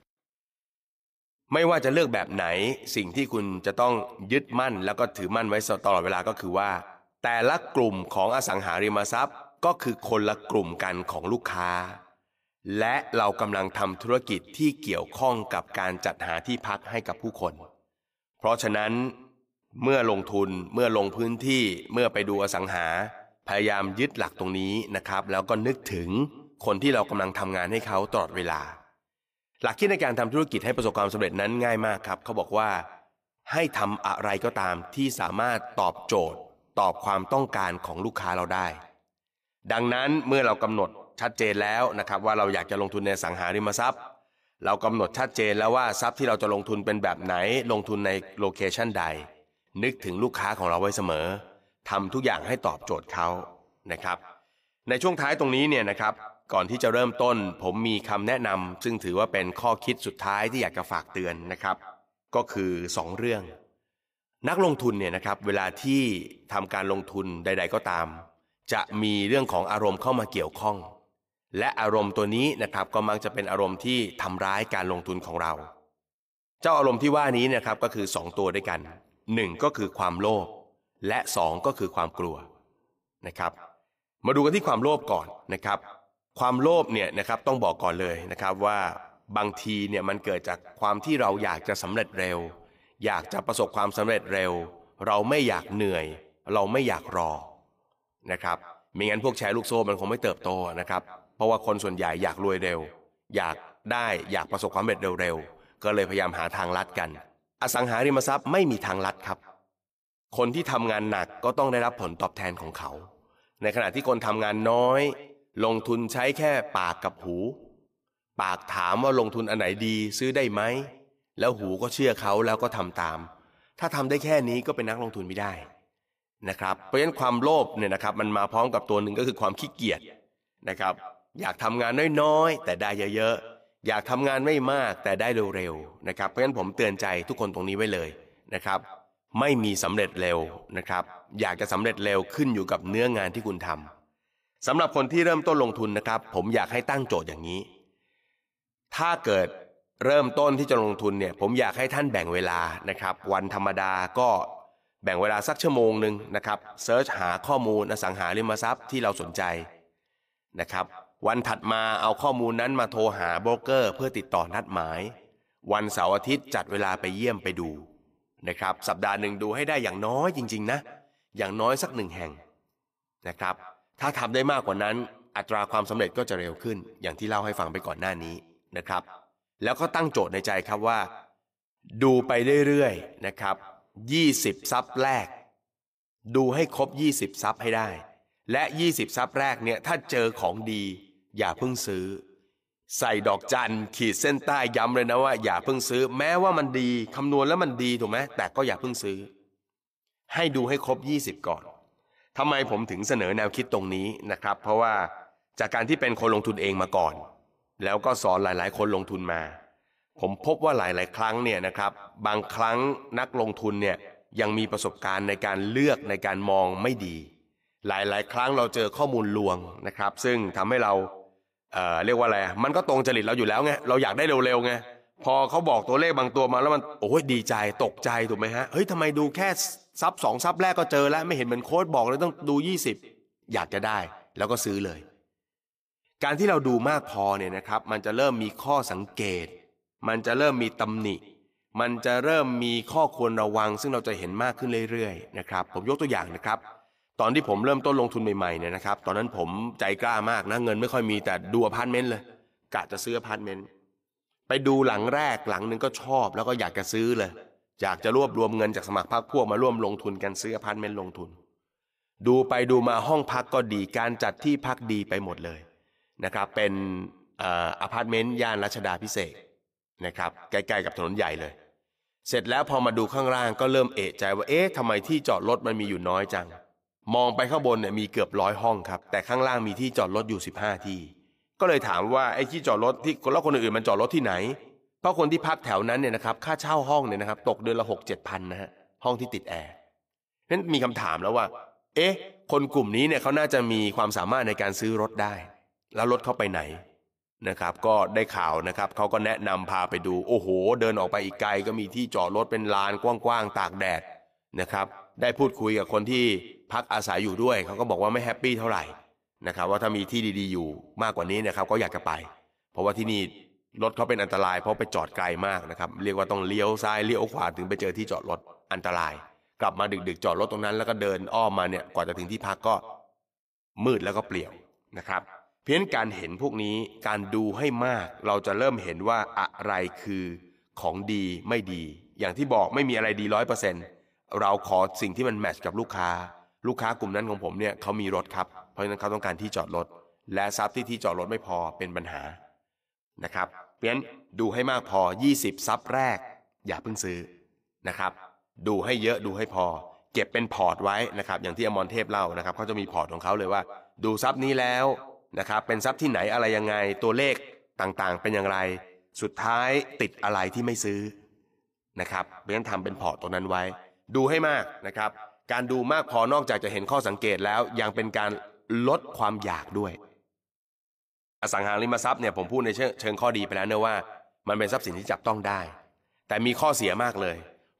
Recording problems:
echo of what is said; faint; throughout; 170 ms later, 20 dB below the speech

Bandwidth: 15 kHz